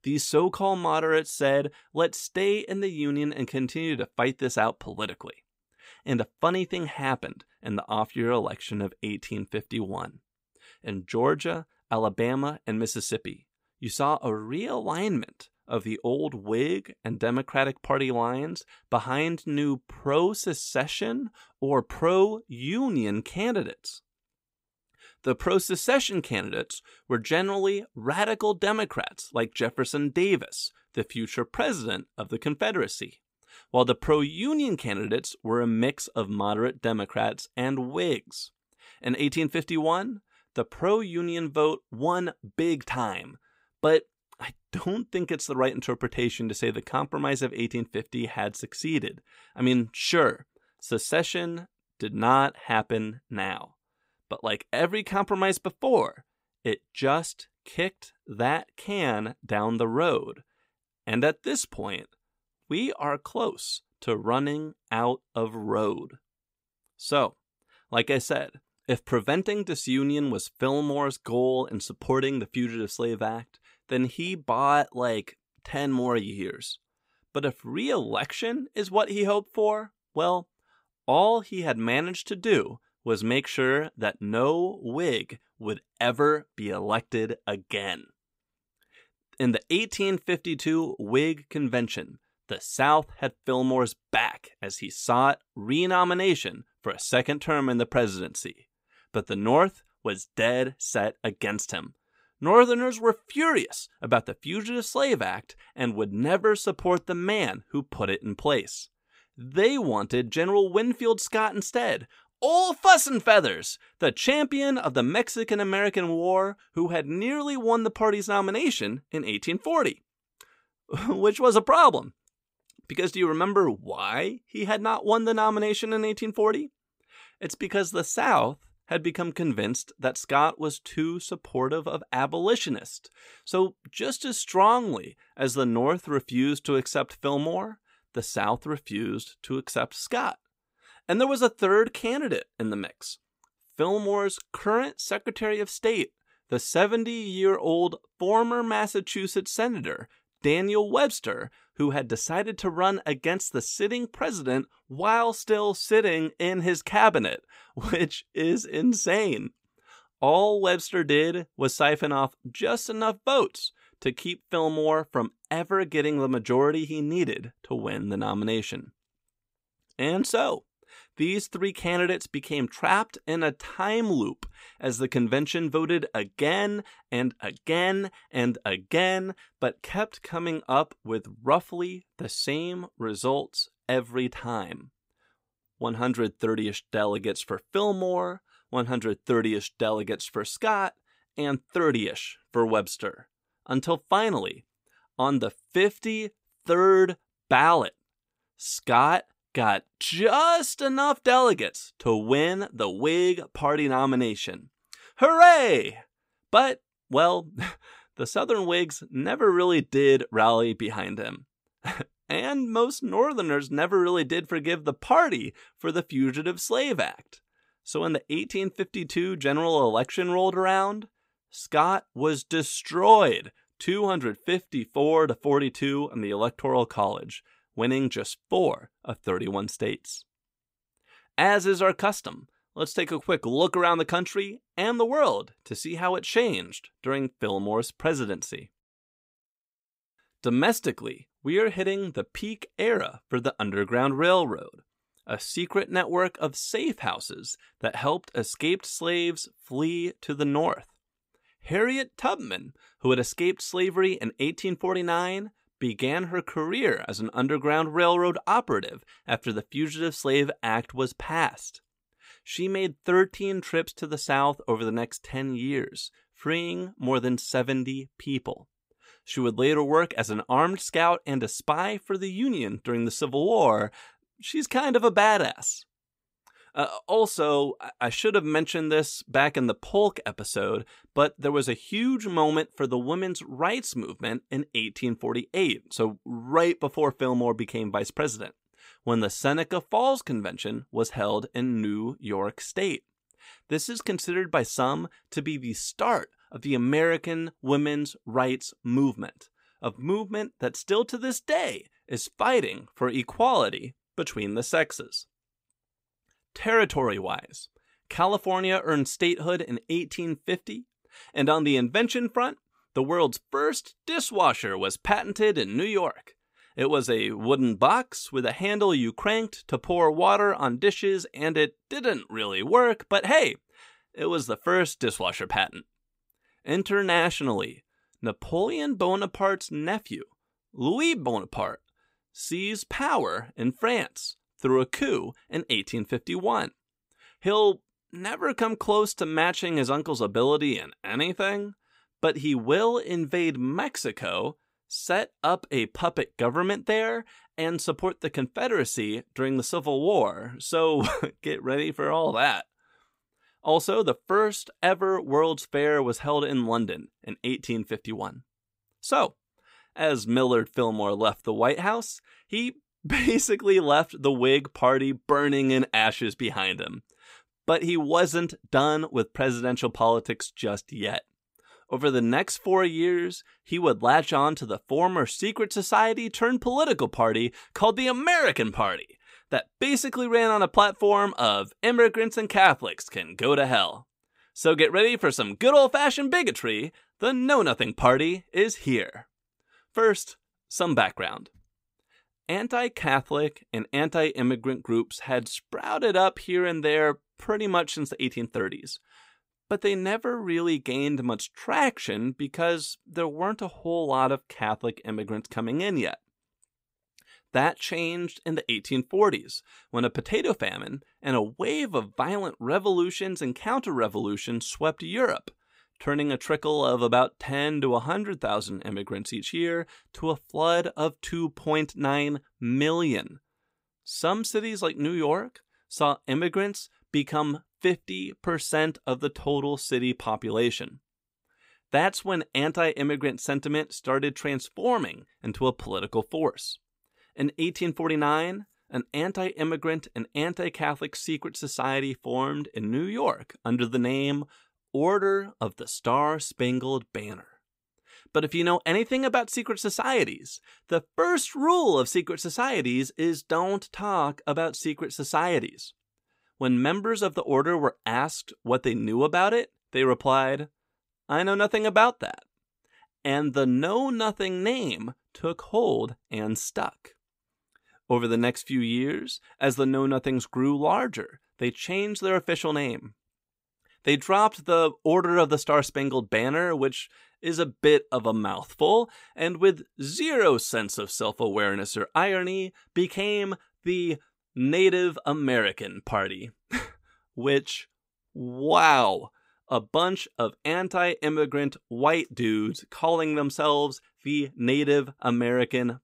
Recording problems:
none

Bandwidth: 15.5 kHz